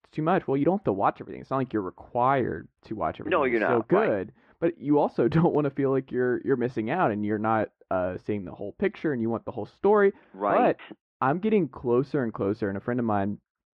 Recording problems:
muffled; very; fading above 1.5 kHz

